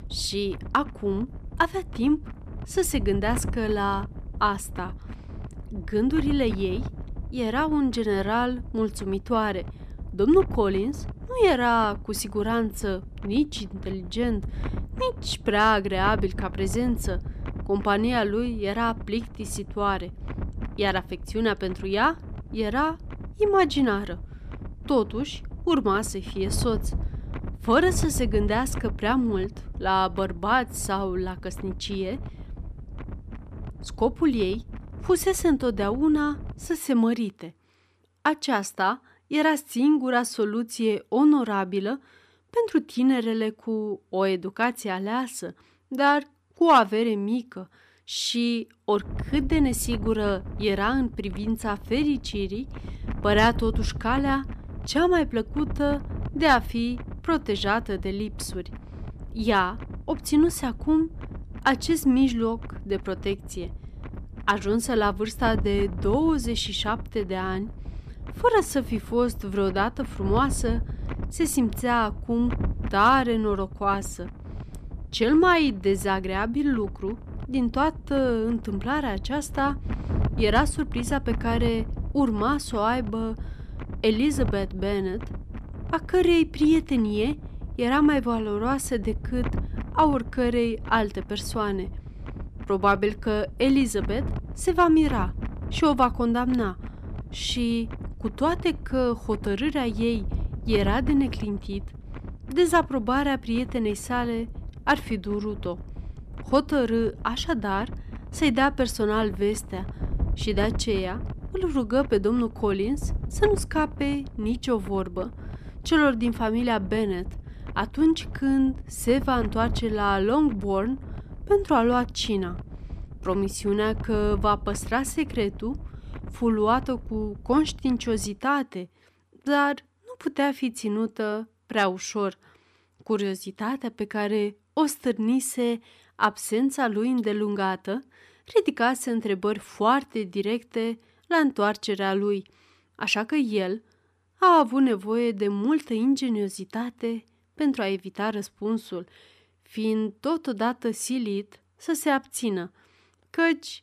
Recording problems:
wind noise on the microphone; occasional gusts; until 37 s and from 49 s to 2:08; 20 dB below the speech

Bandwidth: 14.5 kHz